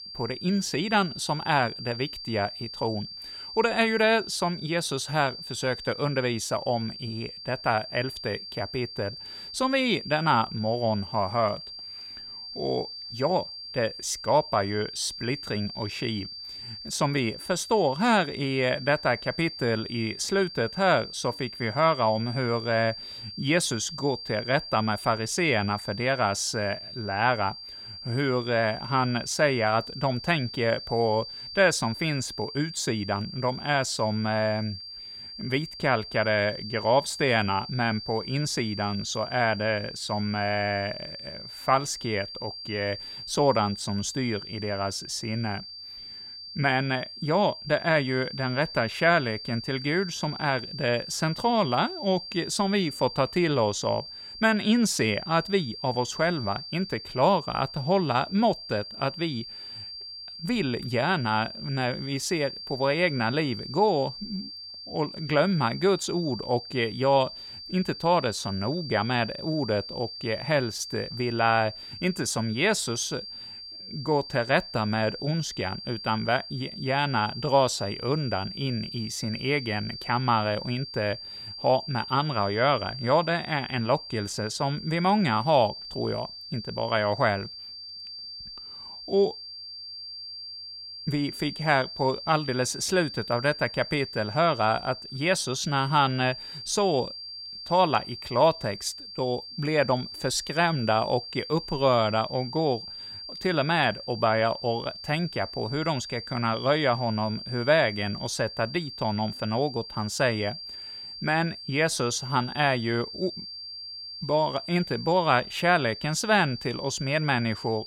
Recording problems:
high-pitched whine; noticeable; throughout; 4.5 kHz, 10 dB below the speech

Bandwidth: 16.5 kHz